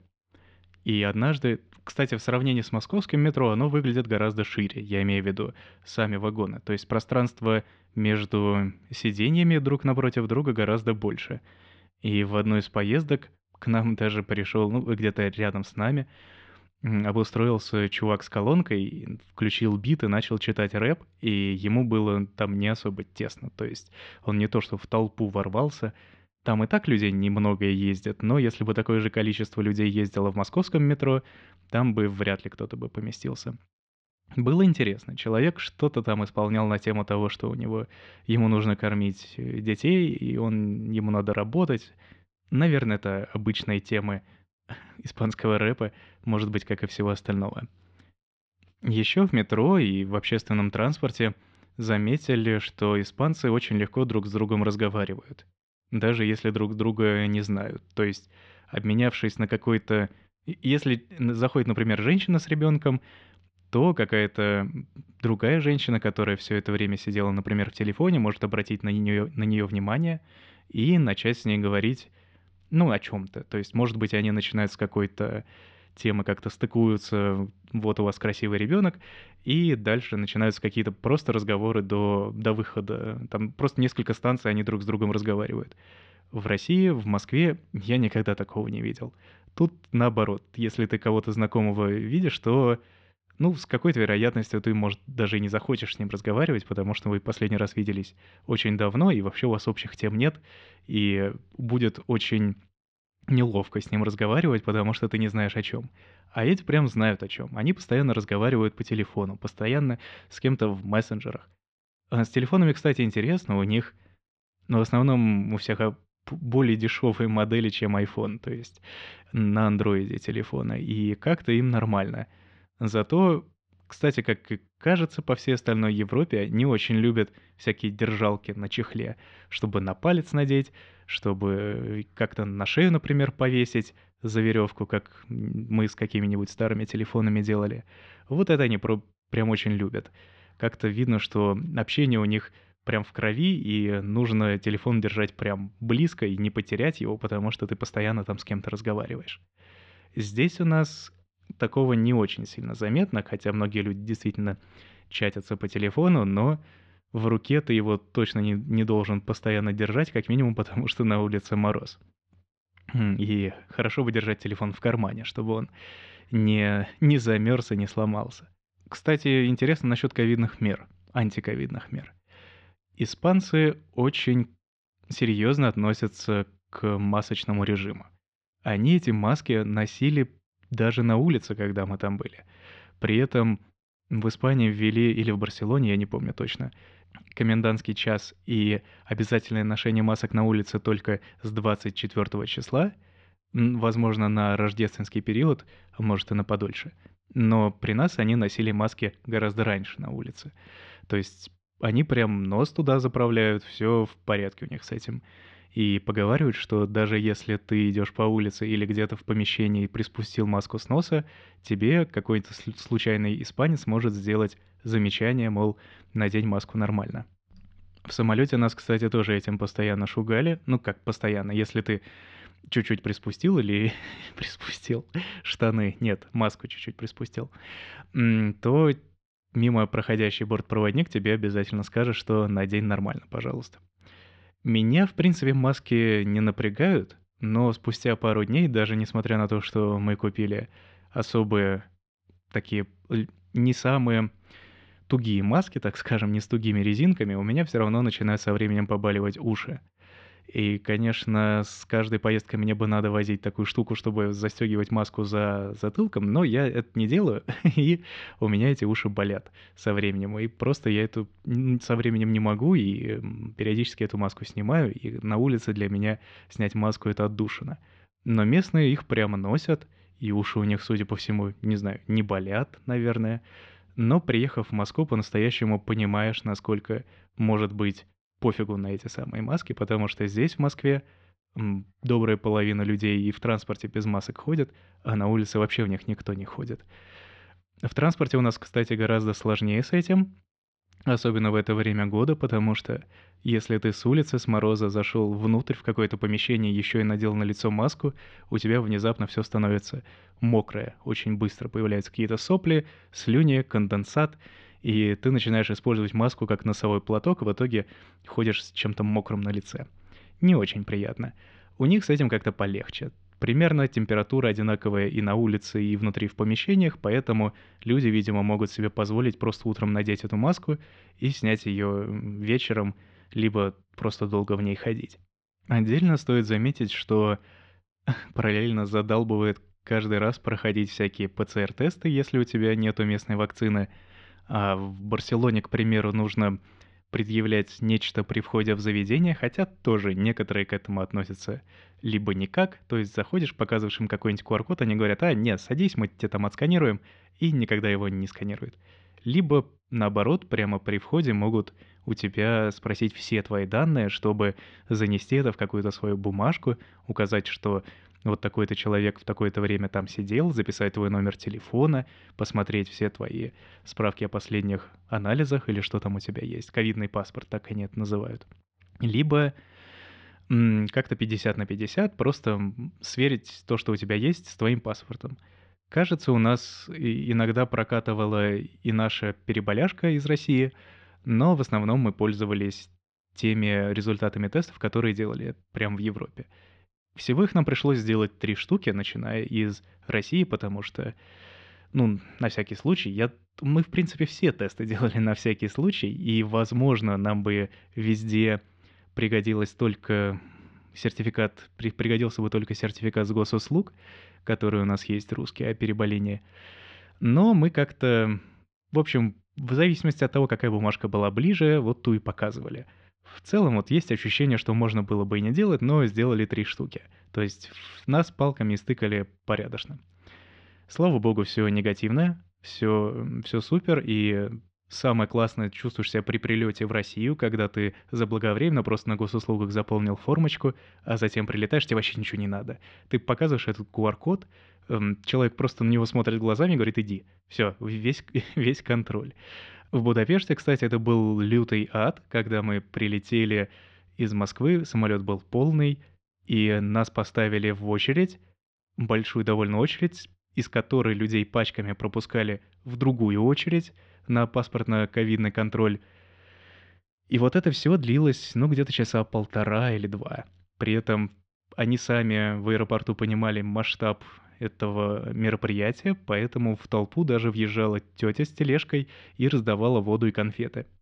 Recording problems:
muffled; slightly; fading above 4 kHz

